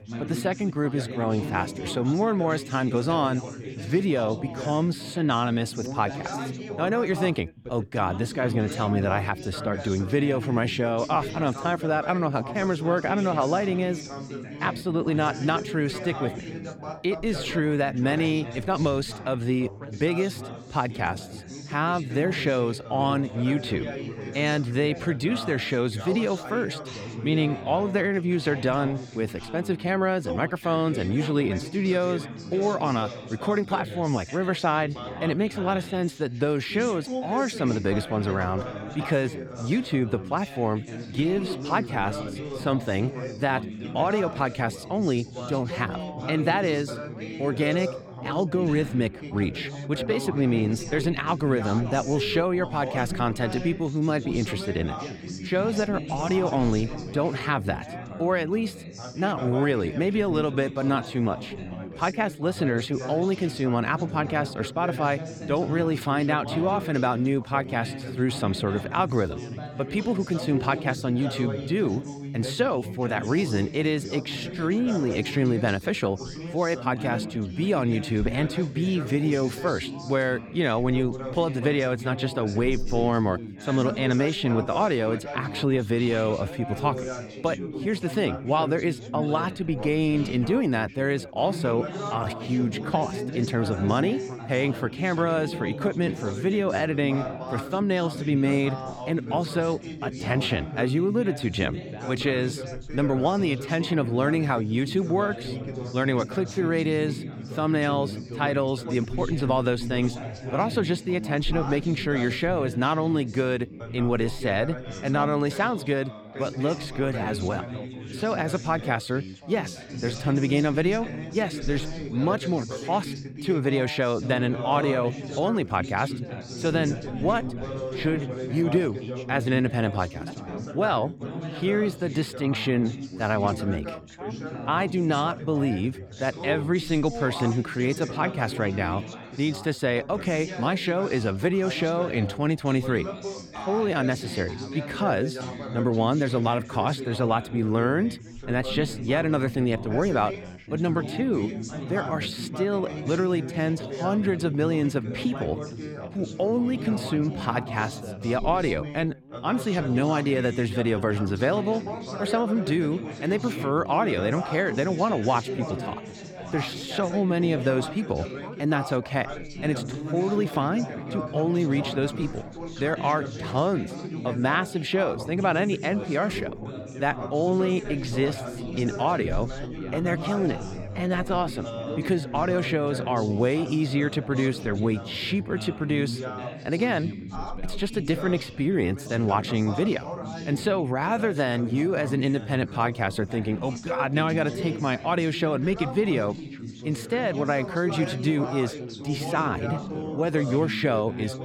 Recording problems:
background chatter; loud; throughout; 4 voices, 9 dB below the speech

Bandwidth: 17.5 kHz